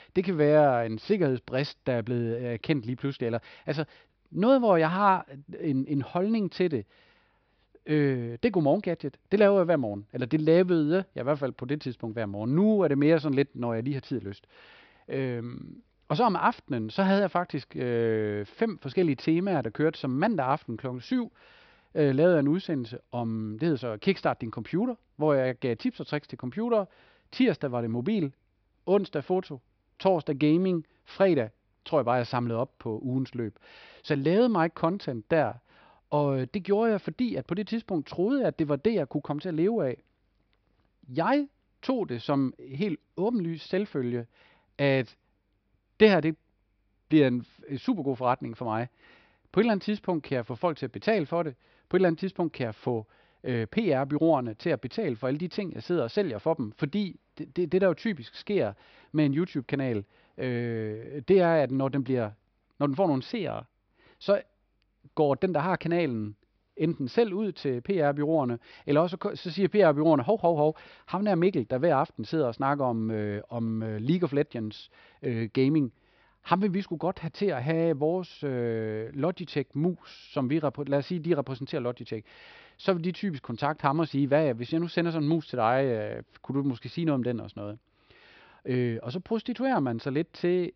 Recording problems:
high frequencies cut off; noticeable; nothing above 5.5 kHz

